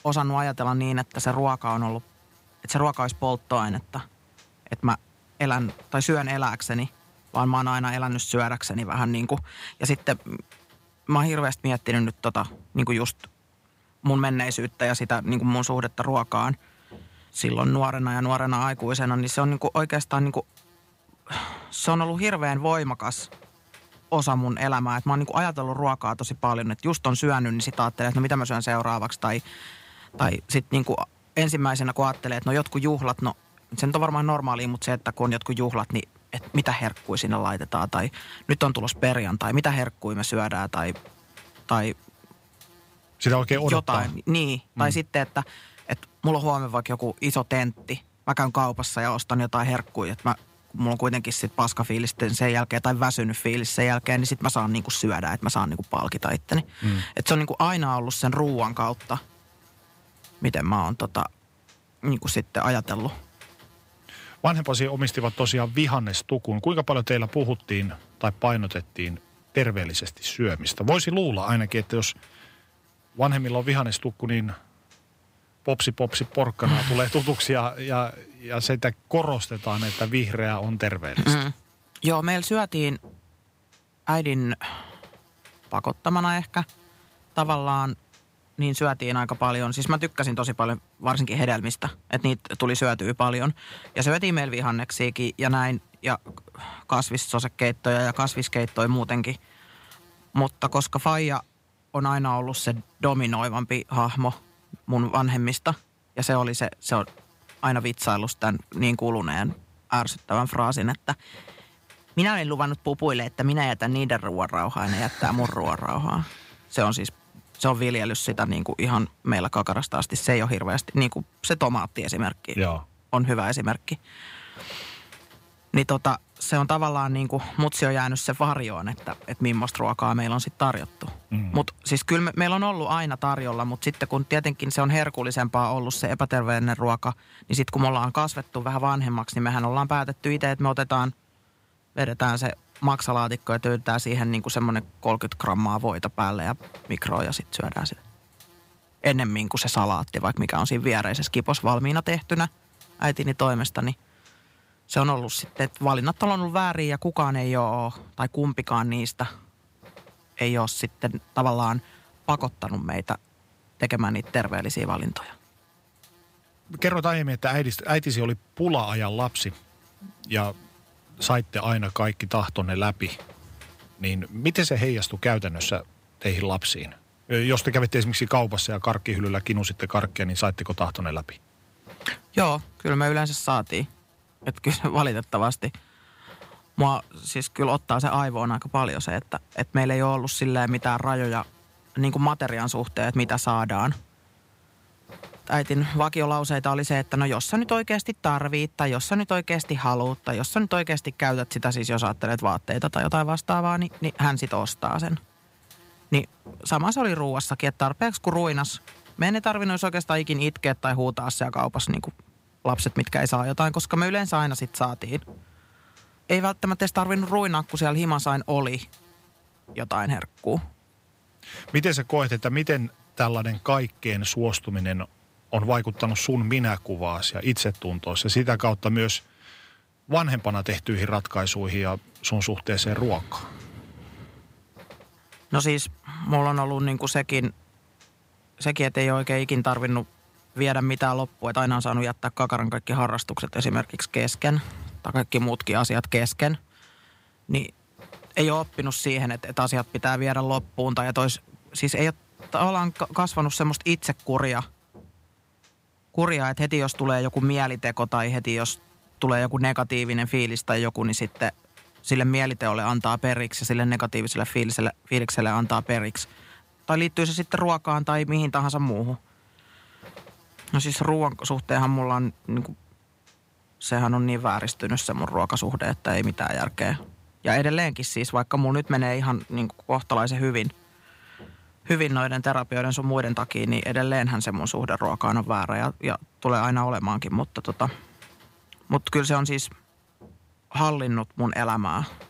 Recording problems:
electrical hum; faint; throughout; 50 Hz, 30 dB below the speech

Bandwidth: 15.5 kHz